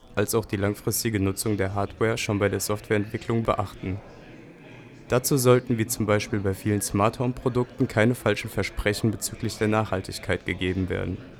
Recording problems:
chatter from many people; noticeable; throughout; 20 dB below the speech

